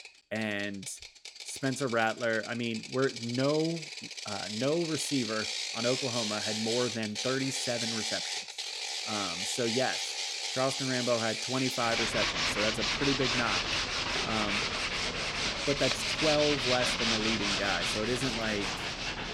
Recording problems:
machinery noise; very loud; throughout; 2 dB above the speech

